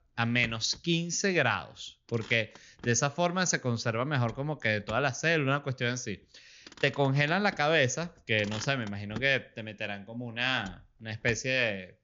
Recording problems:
high frequencies cut off; noticeable; nothing above 7 kHz
traffic noise; noticeable; throughout; 20 dB below the speech

